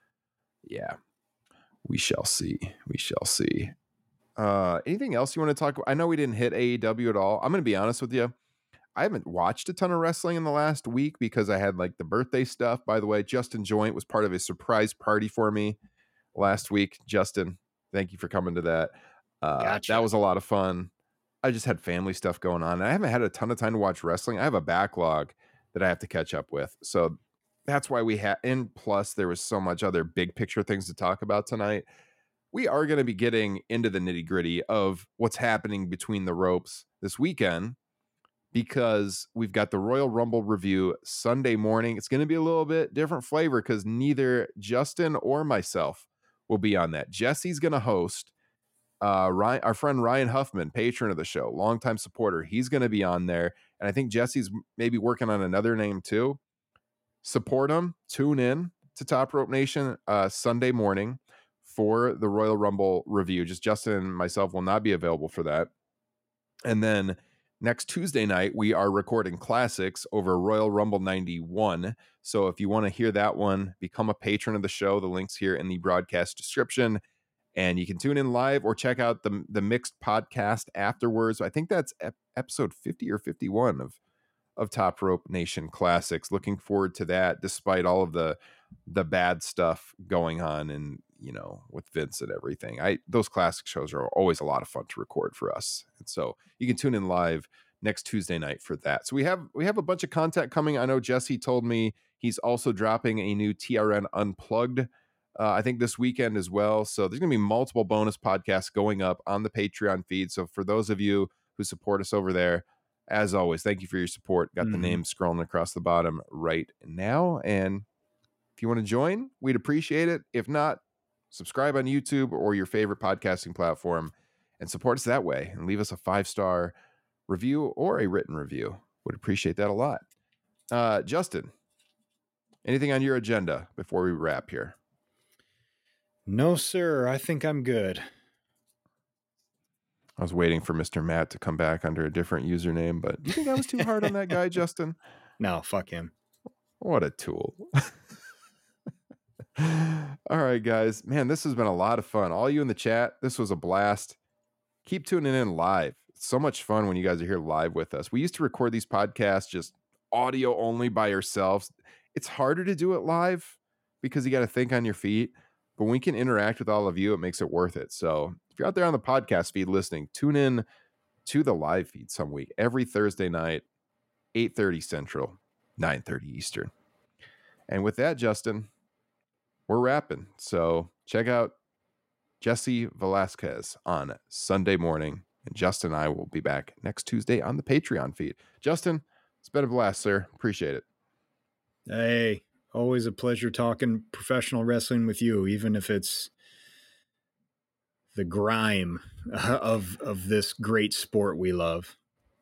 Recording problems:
none

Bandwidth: 16 kHz